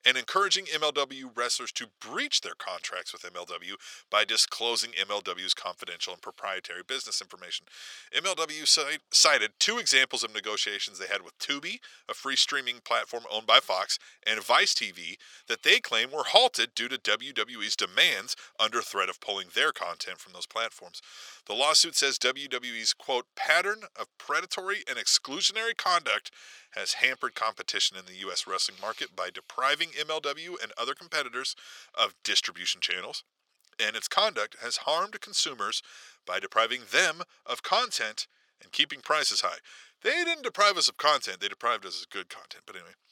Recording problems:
thin; very; fading below 700 Hz

